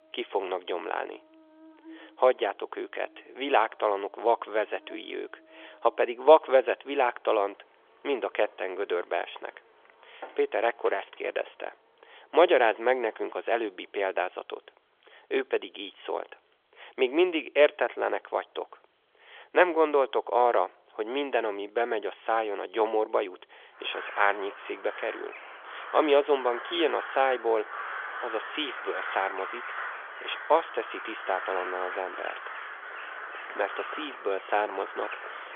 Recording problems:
phone-call audio; nothing above 3.5 kHz
animal sounds; noticeable; throughout; 10 dB below the speech

